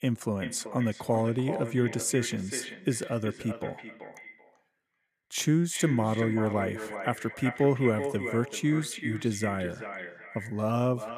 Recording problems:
echo of what is said; strong; throughout; 380 ms later, 9 dB below the speech

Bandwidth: 14.5 kHz